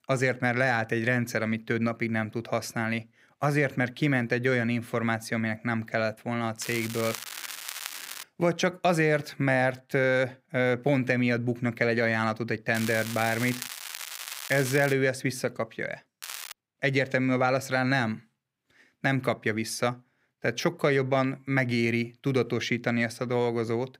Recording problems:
crackling; loud; from 6.5 to 8 s, from 13 to 15 s and at 16 s; 10 dB below the speech

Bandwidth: 15.5 kHz